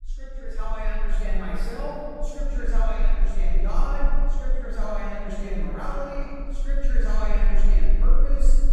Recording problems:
room echo; strong; dies away in 2.4 s
off-mic speech; far
low rumble; faint; throughout; 20 dB below the speech

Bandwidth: 15.5 kHz